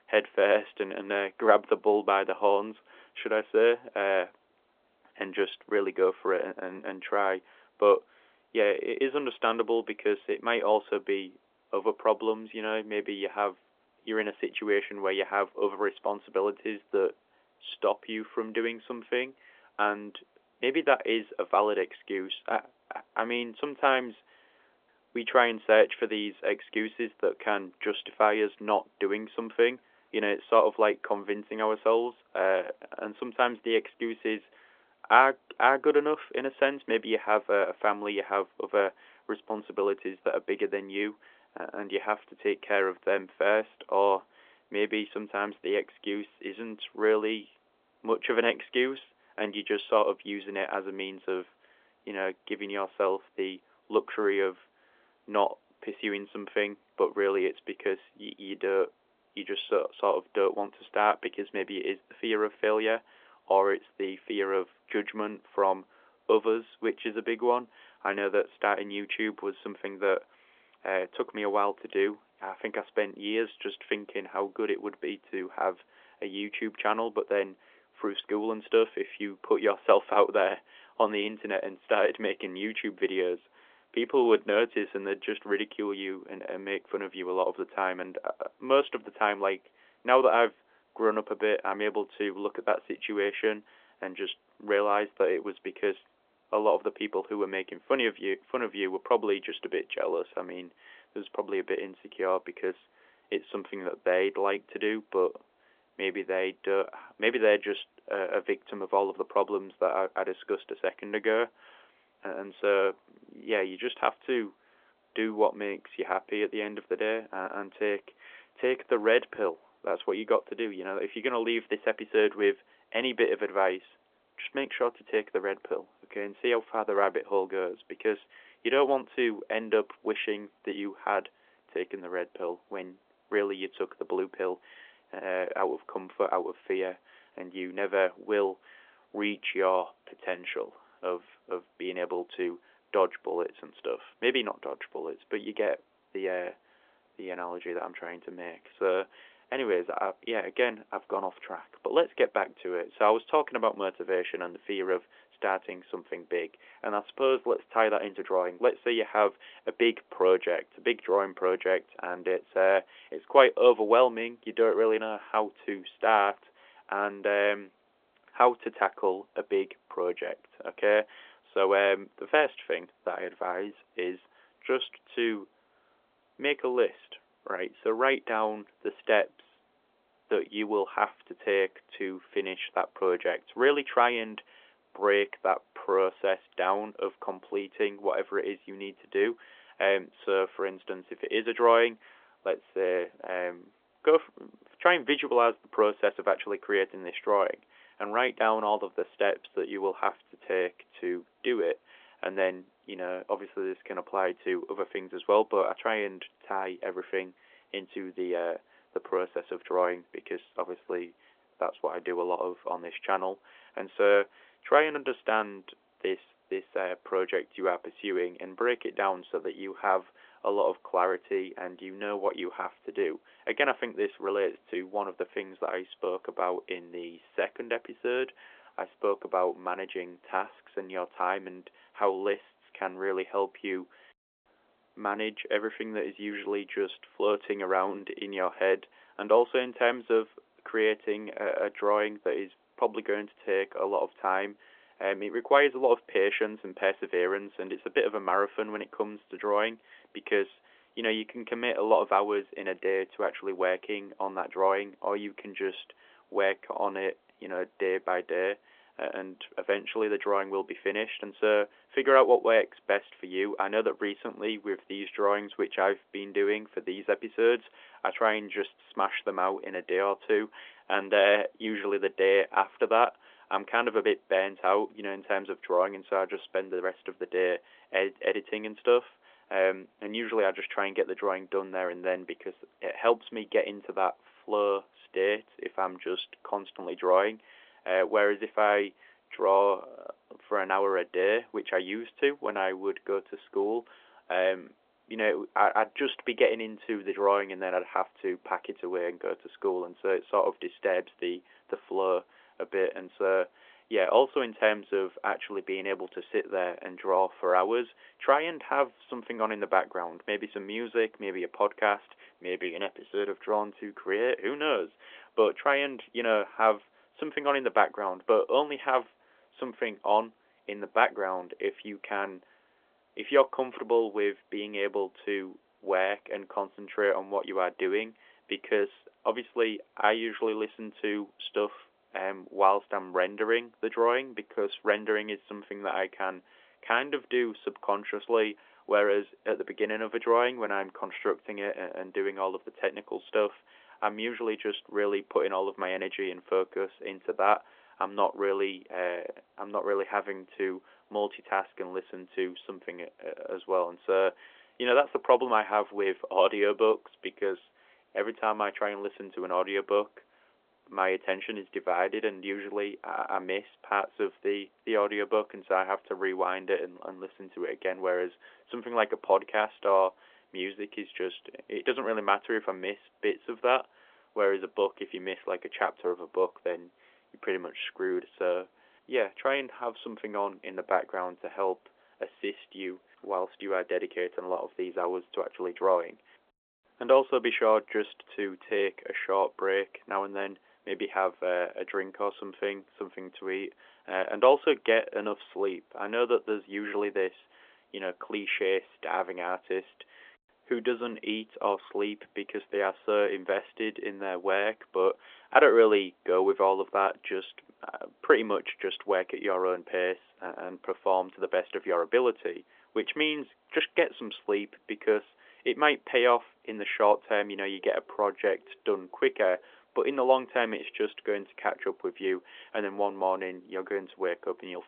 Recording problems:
phone-call audio; nothing above 3.5 kHz

